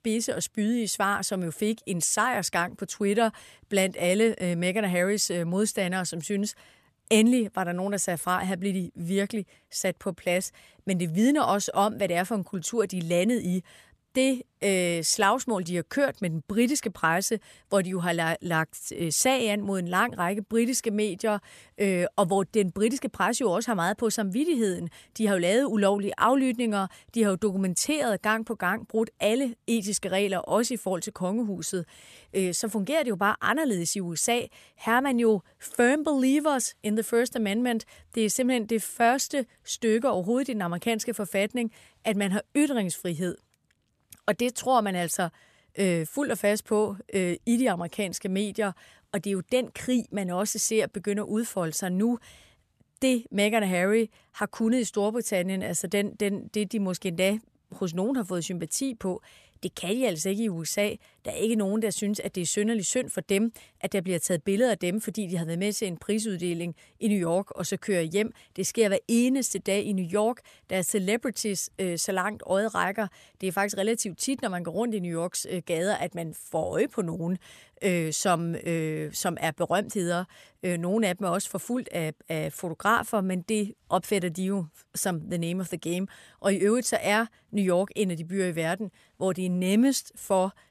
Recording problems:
none

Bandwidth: 14 kHz